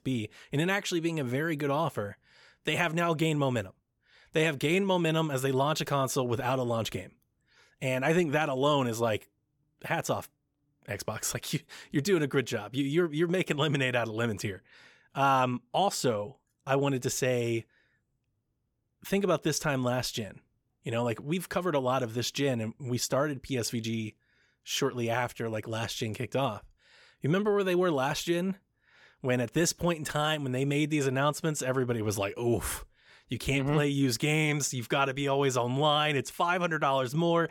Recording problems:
none

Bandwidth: 18 kHz